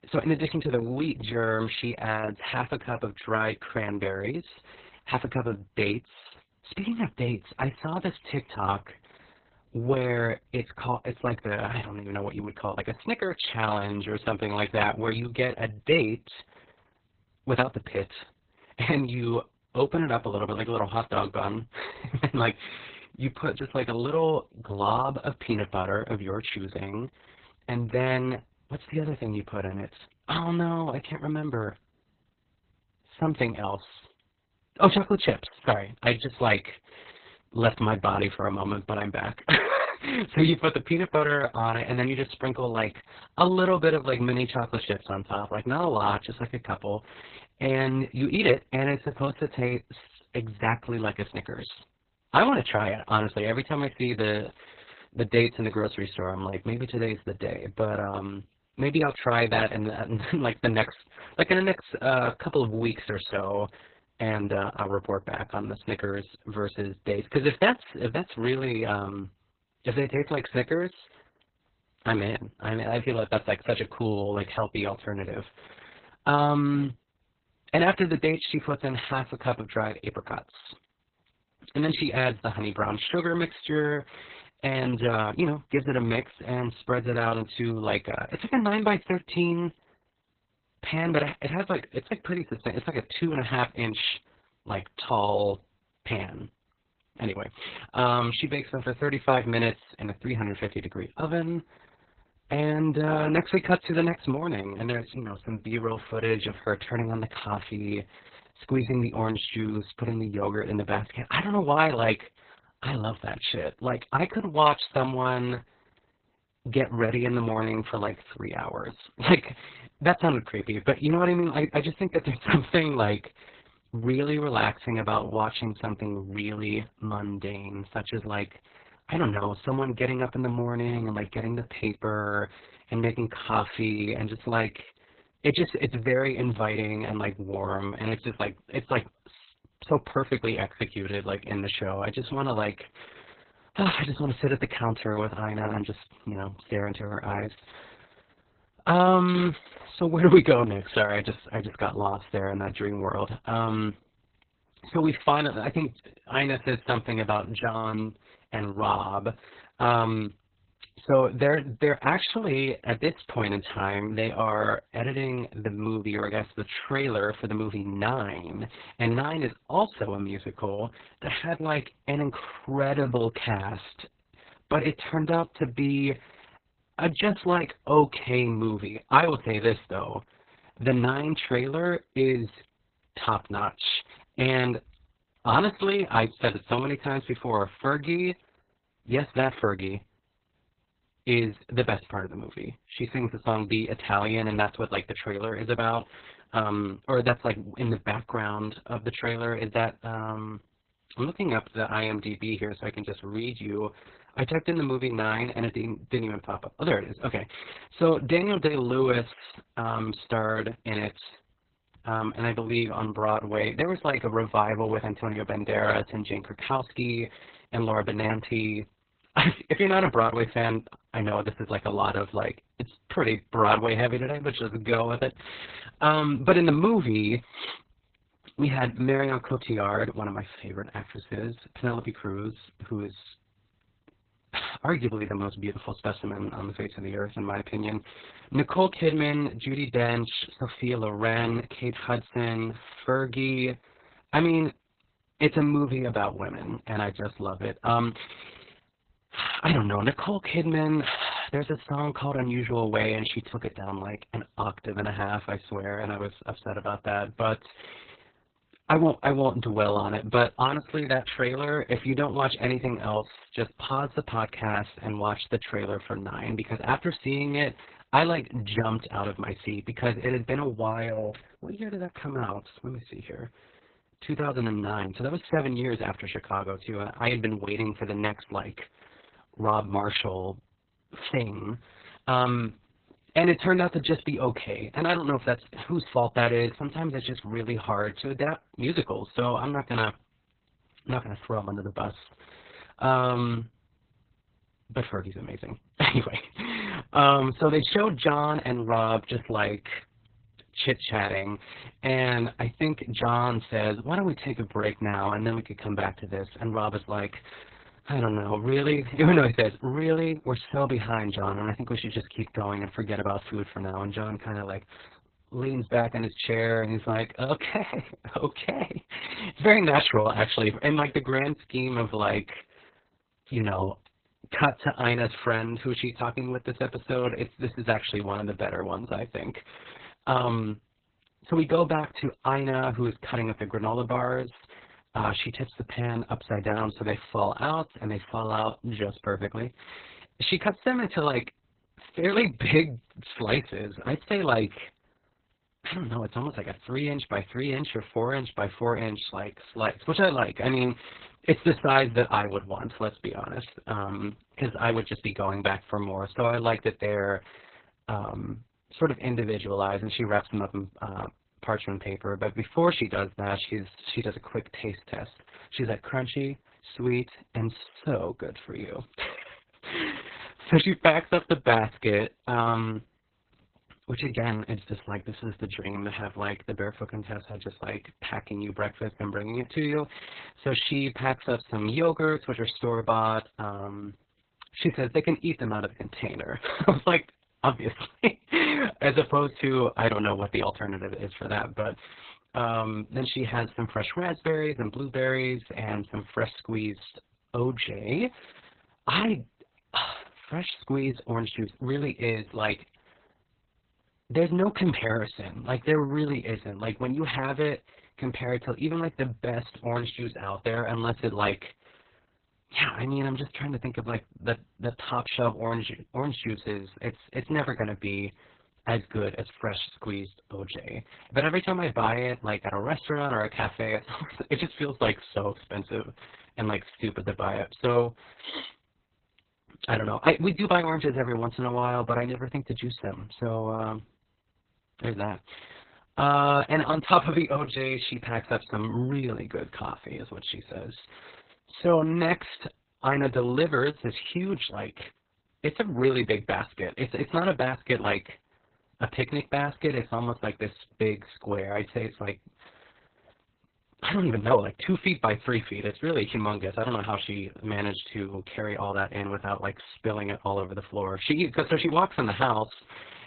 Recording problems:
garbled, watery; badly; nothing above 4 kHz

